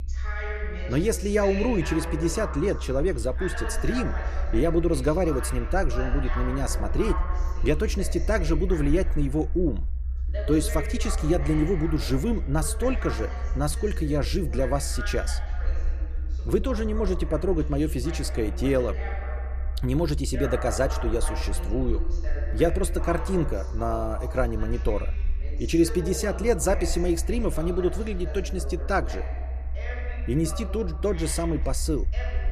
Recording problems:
voice in the background; noticeable; throughout; 10 dB below the speech
low rumble; faint; throughout; 25 dB below the speech

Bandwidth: 14.5 kHz